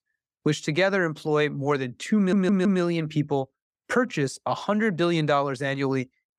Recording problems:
audio stuttering; at 2 s

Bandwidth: 15.5 kHz